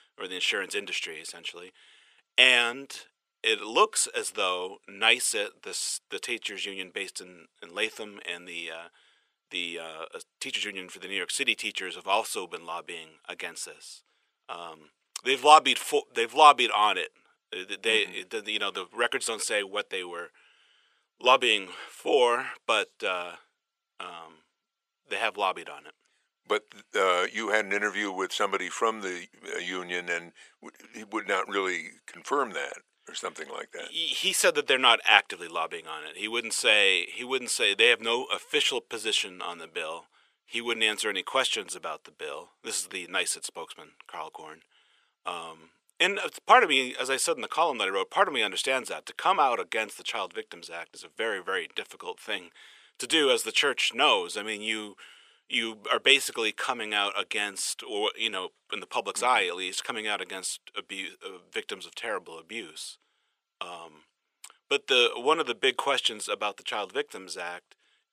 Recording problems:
thin; very; fading below 550 Hz

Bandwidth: 14.5 kHz